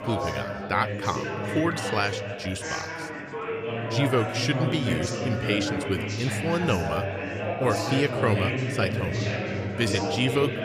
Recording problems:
chatter from many people; loud; throughout; 1 dB below the speech

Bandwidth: 15 kHz